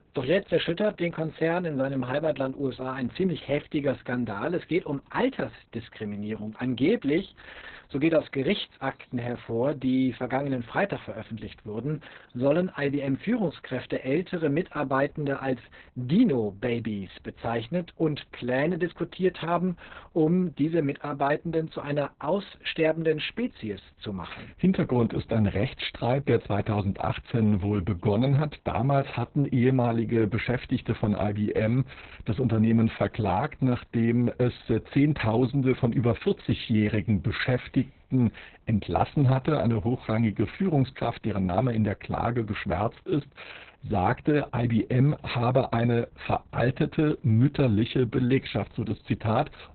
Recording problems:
garbled, watery; badly; nothing above 4 kHz

